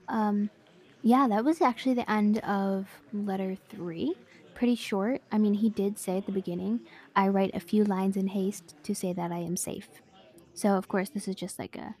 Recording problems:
chatter from many people; faint; throughout; 25 dB below the speech

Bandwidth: 14.5 kHz